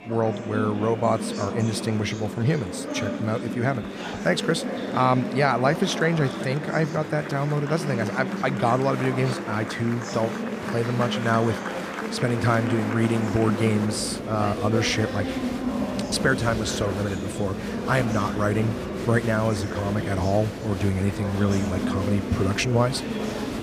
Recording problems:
echo of what is said; faint; throughout; 390 ms later, 20 dB below the speech
murmuring crowd; loud; throughout; 5 dB below the speech

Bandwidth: 15 kHz